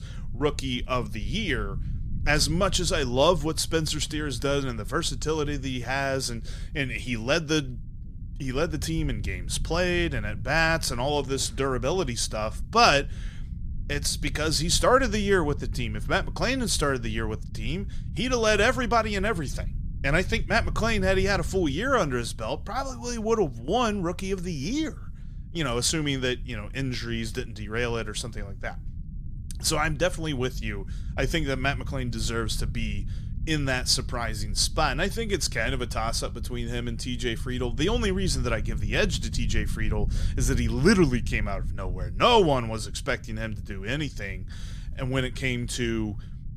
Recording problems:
low rumble; faint; throughout; 25 dB below the speech

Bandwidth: 15 kHz